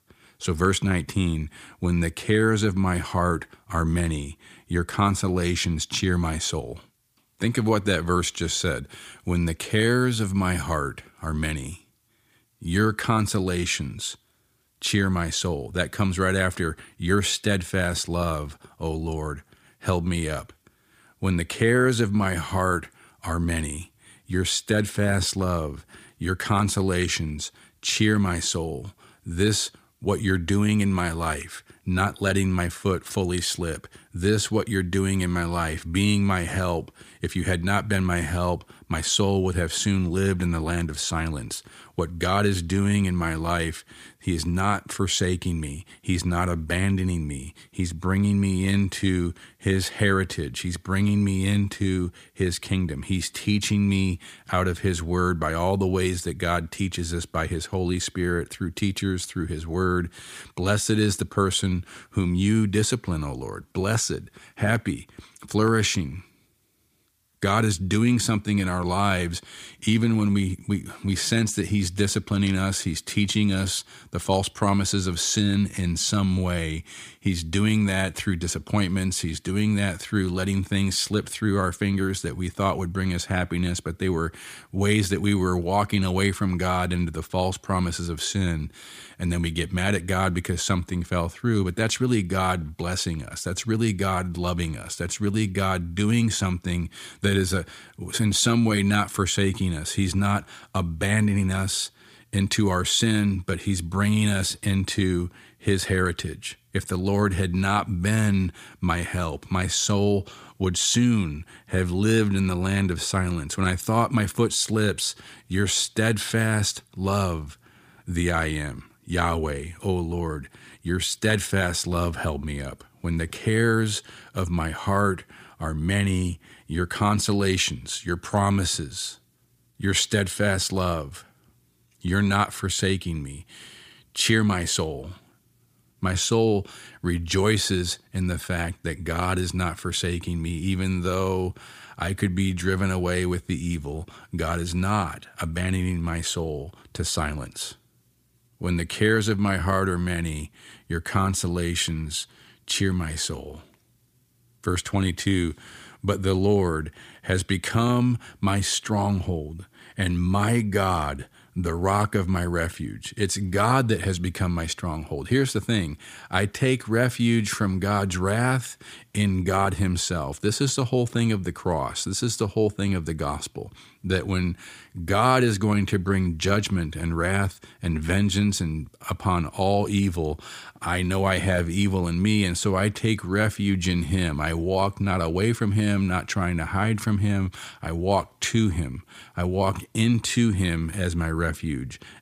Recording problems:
none

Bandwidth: 15 kHz